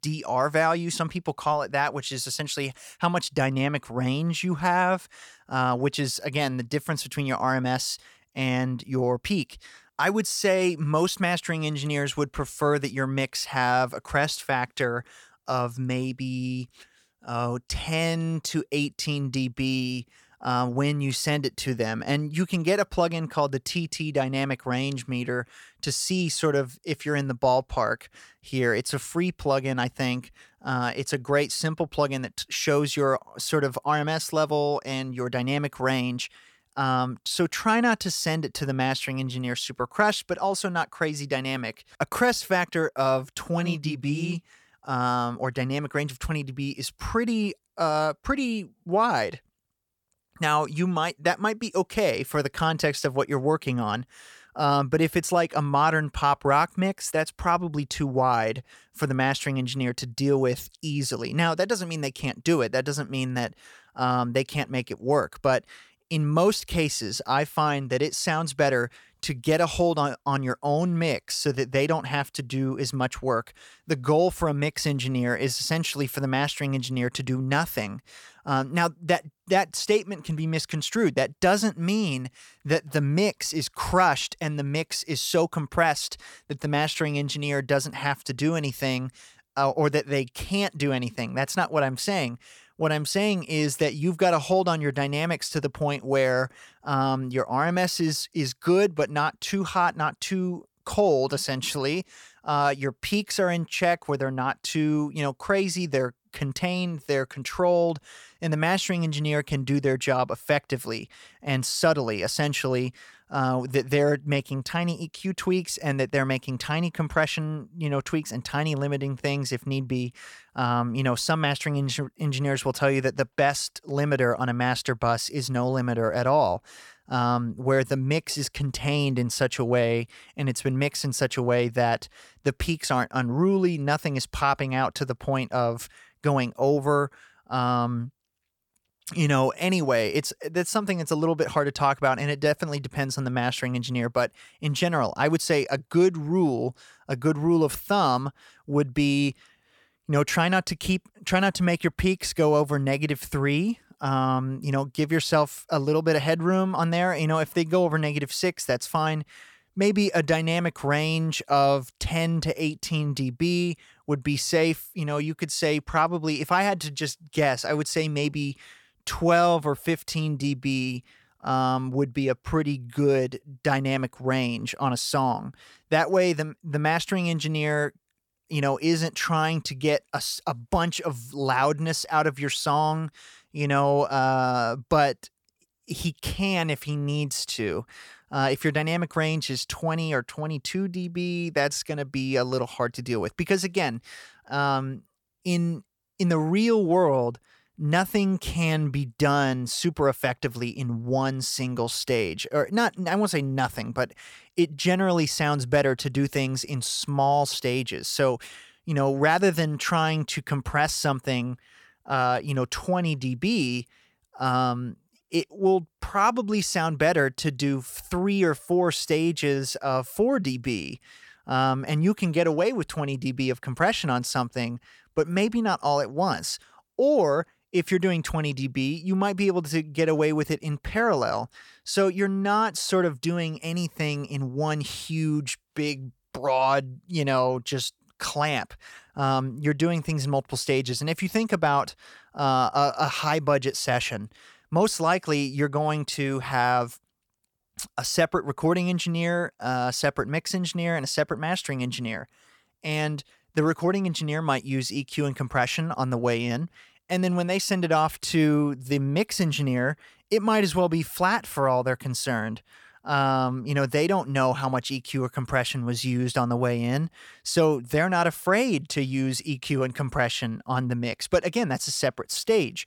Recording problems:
none

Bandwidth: 18 kHz